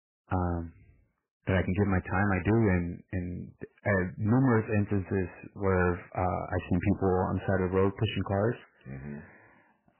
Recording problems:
garbled, watery; badly; nothing above 3 kHz
distortion; slight; 4% of the sound clipped

